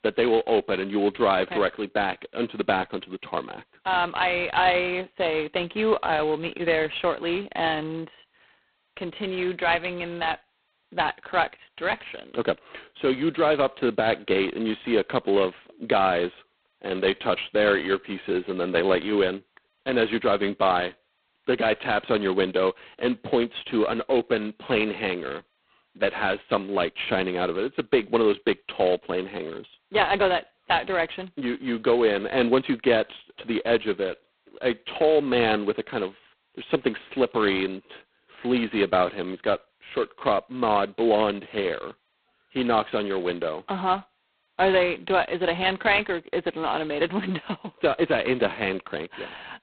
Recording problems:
phone-call audio; poor line; nothing above 4 kHz

